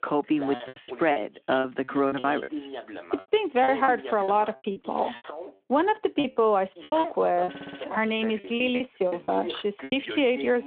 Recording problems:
phone-call audio
voice in the background; noticeable; throughout; 10 dB below the speech
choppy; very; 12% of the speech affected
audio stuttering; at 7.5 s
abrupt cut into speech; at the end

